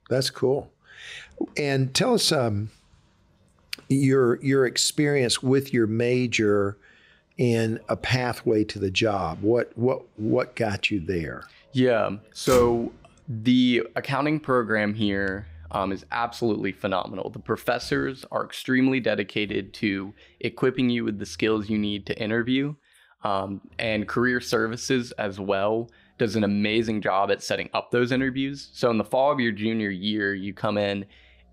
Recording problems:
traffic noise; noticeable; throughout; 20 dB below the speech

